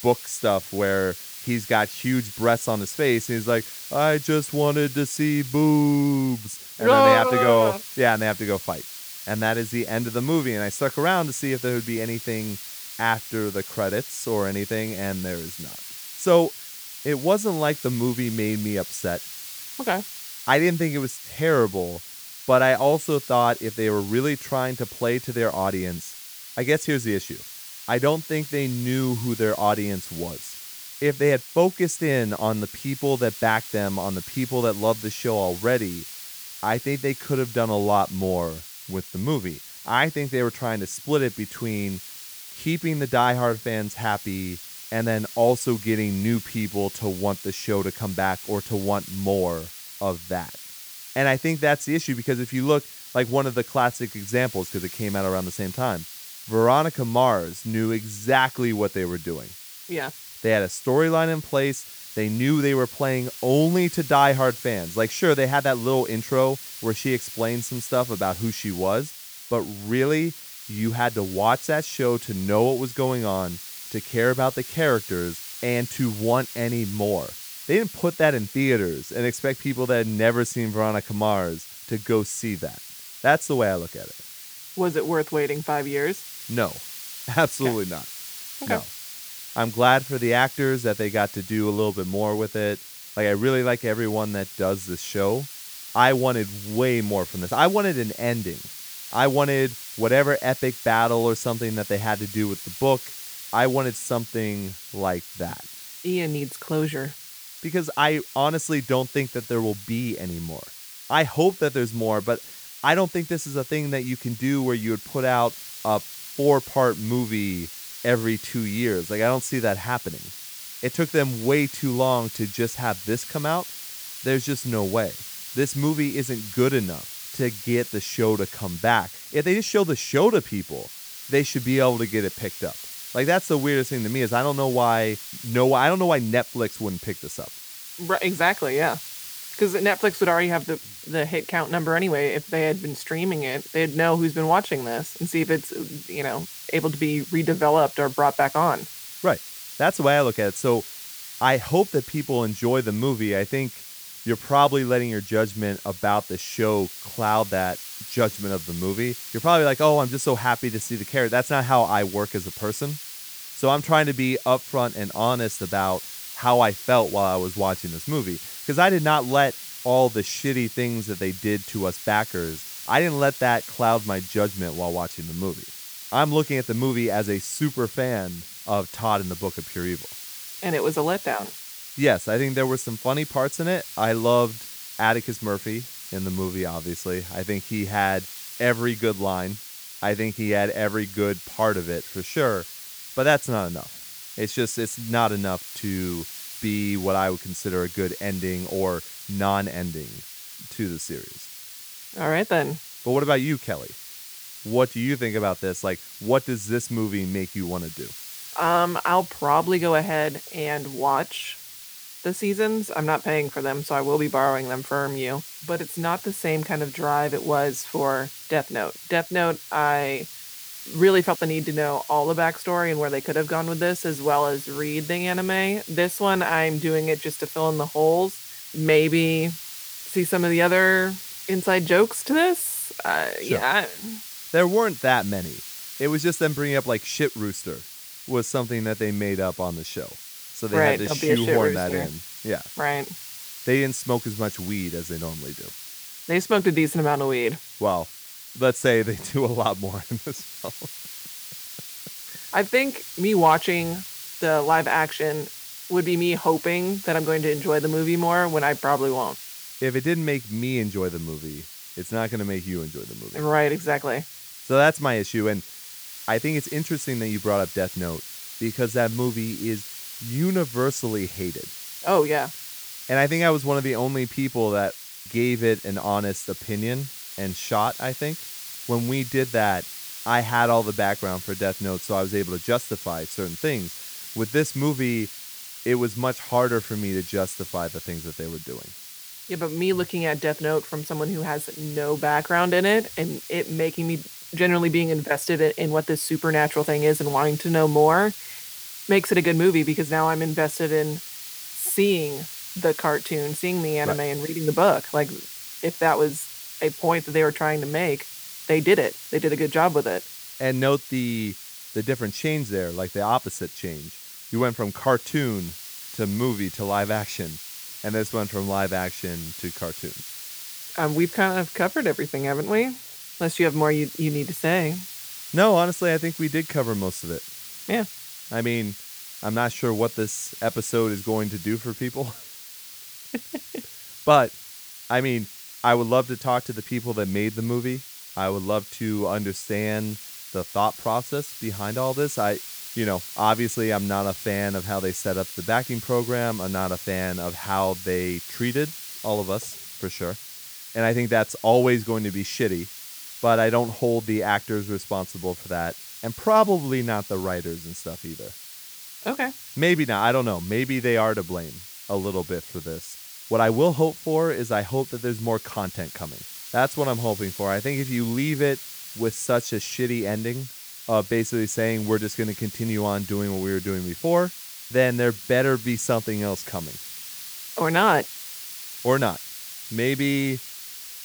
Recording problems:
hiss; noticeable; throughout; 10 dB below the speech

